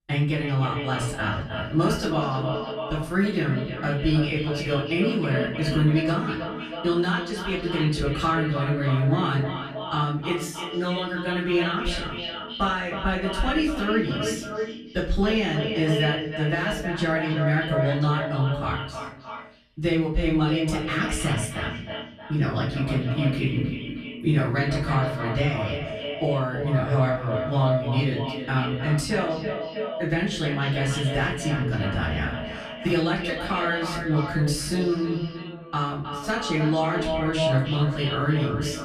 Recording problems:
echo of what is said; strong; throughout; 310 ms later, 6 dB below the speech
off-mic speech; far
room echo; slight; dies away in 0.4 s

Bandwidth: 14 kHz